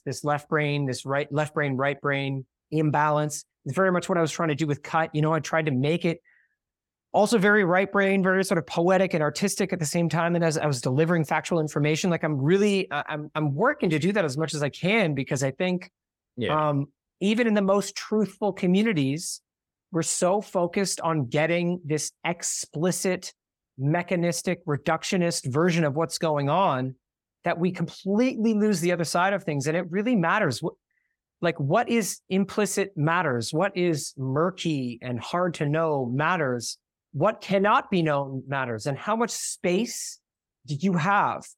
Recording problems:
none

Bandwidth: 17 kHz